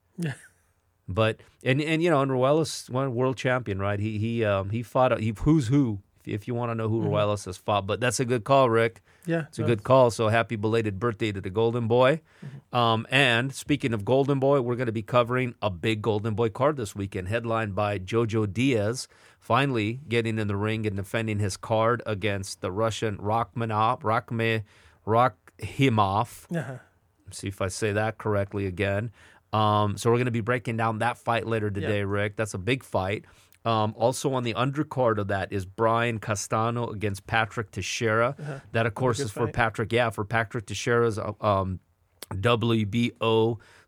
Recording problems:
none

